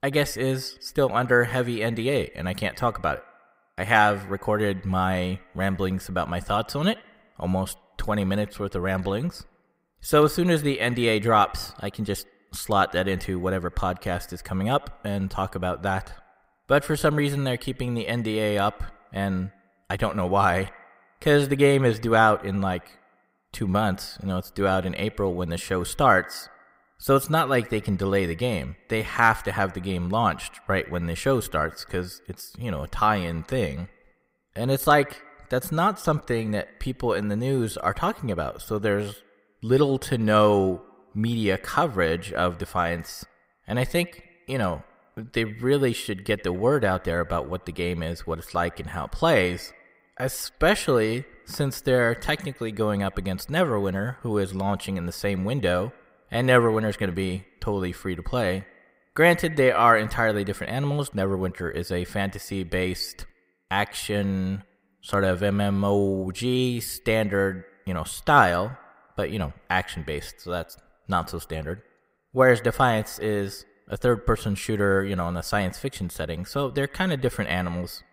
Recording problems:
echo of what is said; faint; throughout; 80 ms later, 20 dB below the speech

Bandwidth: 15.5 kHz